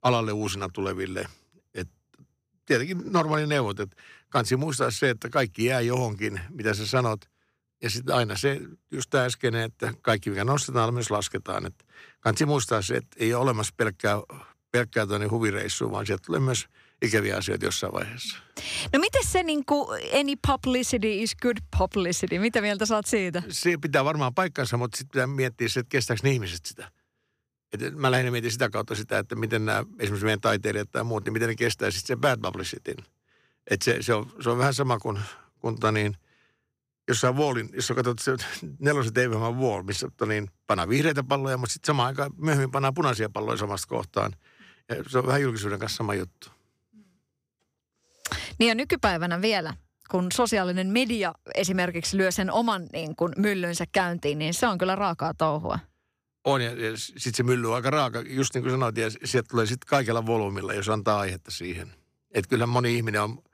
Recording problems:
none

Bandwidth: 15 kHz